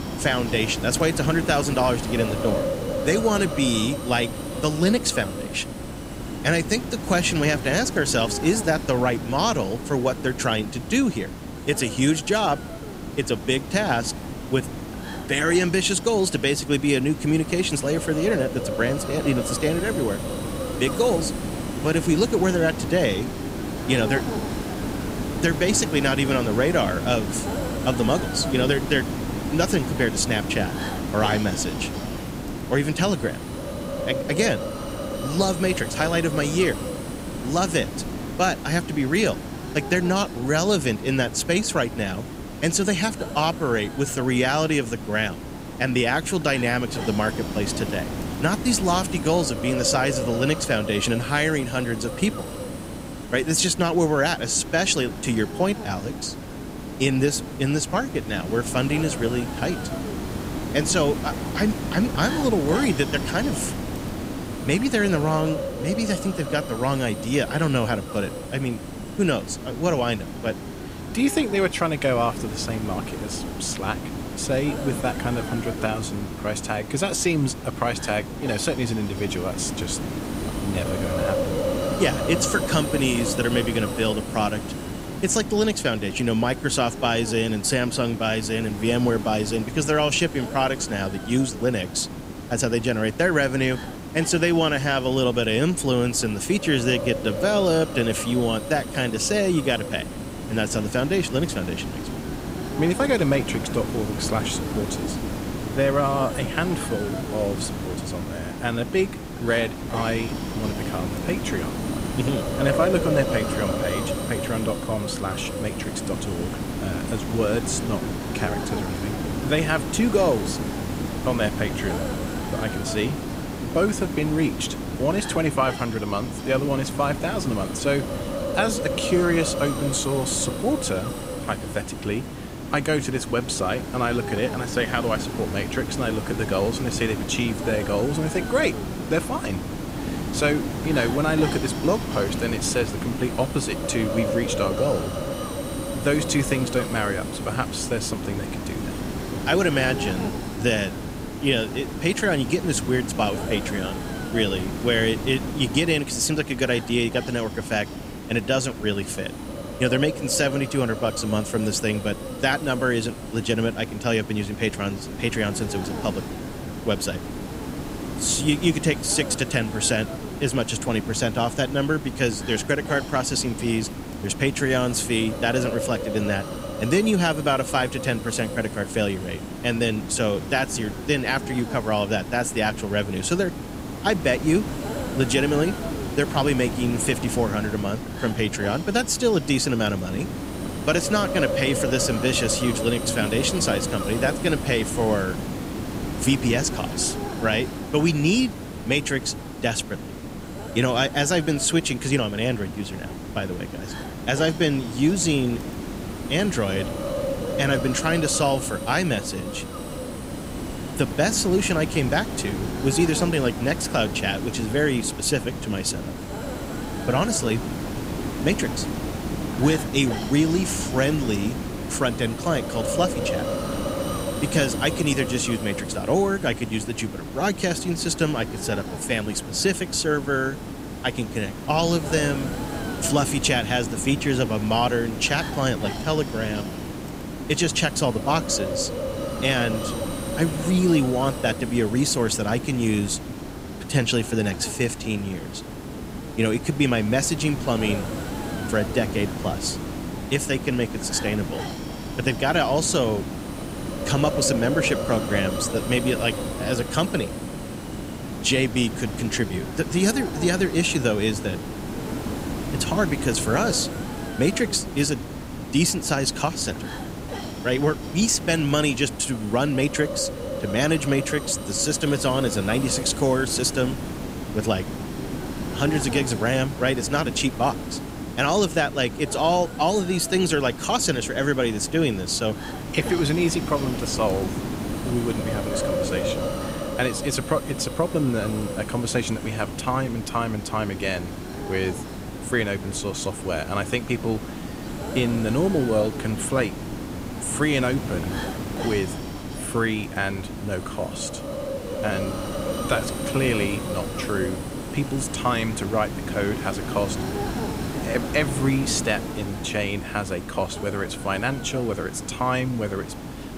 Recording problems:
hiss; loud; throughout; 7 dB below the speech

